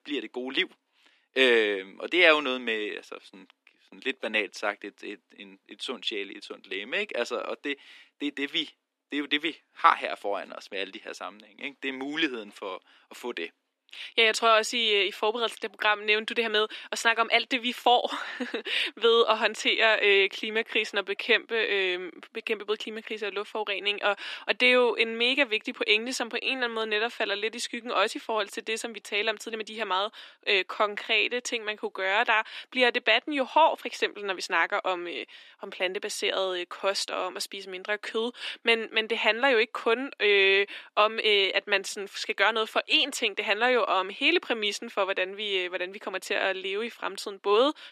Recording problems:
thin; somewhat; fading below 250 Hz

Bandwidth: 14 kHz